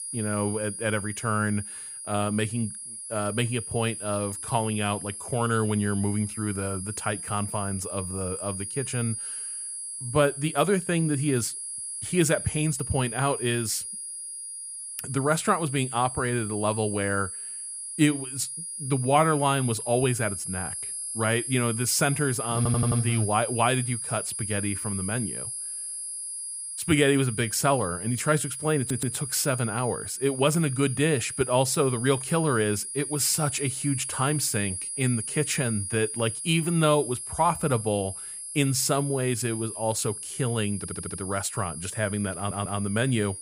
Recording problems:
high-pitched whine; loud; throughout; 10.5 kHz, 6 dB below the speech
audio stuttering; 4 times, first at 23 s

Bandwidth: 15 kHz